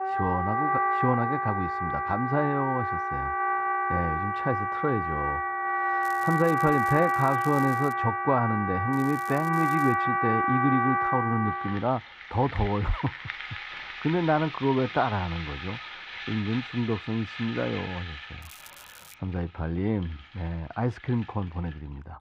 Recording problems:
muffled; very; fading above 1.5 kHz
background music; very loud; throughout; as loud as the speech
crackling; noticeable; from 6 to 8 s, from 9 to 10 s and at 18 s; 20 dB below the speech

